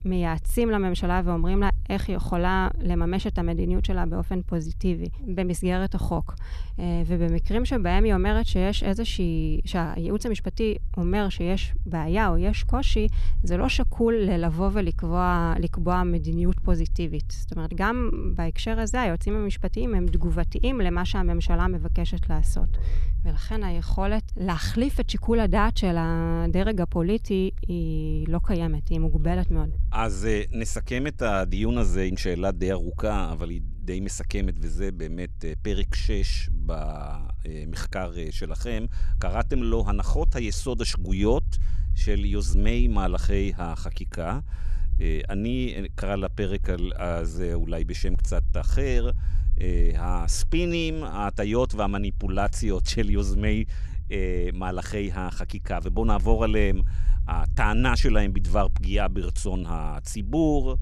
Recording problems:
low rumble; faint; throughout; 20 dB below the speech

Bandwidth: 13.5 kHz